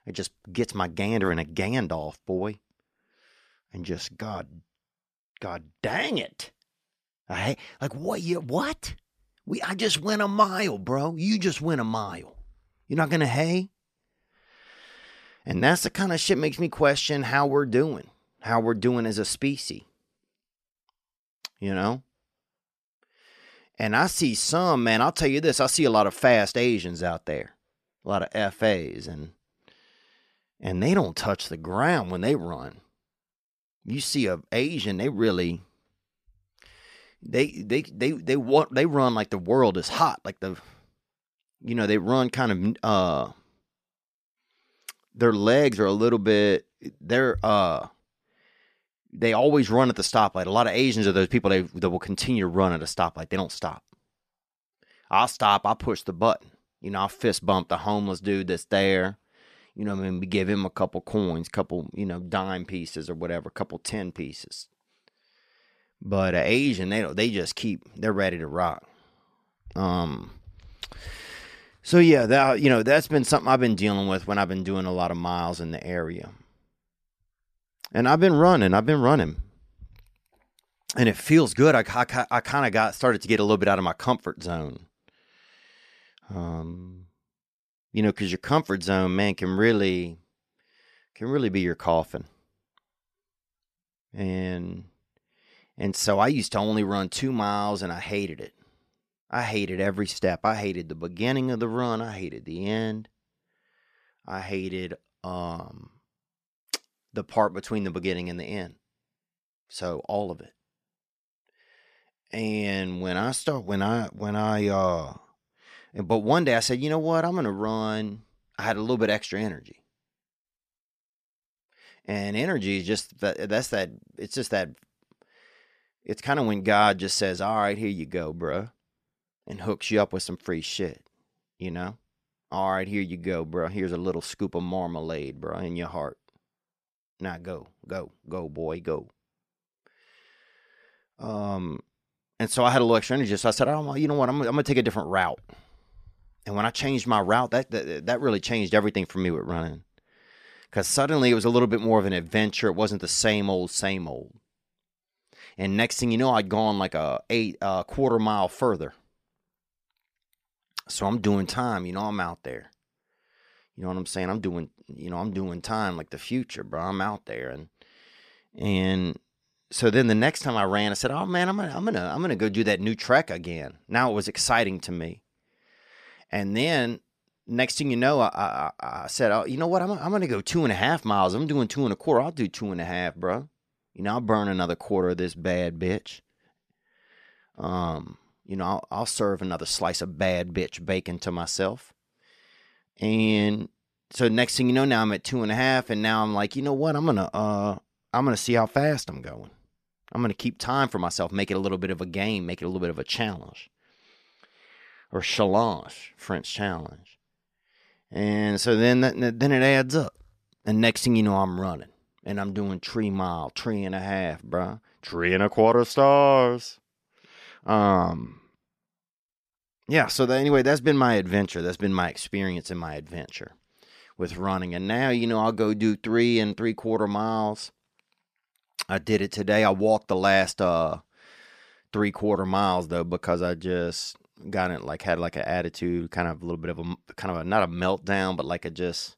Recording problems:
none

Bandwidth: 14.5 kHz